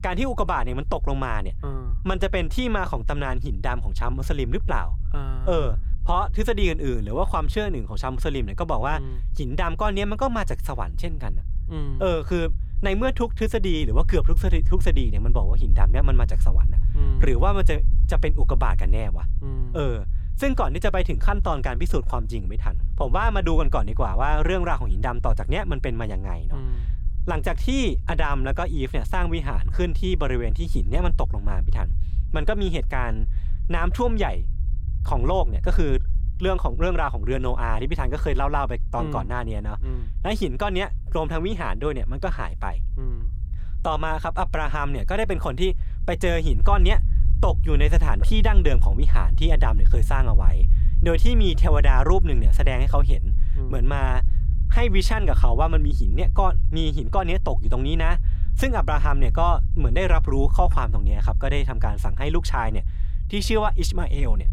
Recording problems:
low rumble; noticeable; throughout; 20 dB below the speech

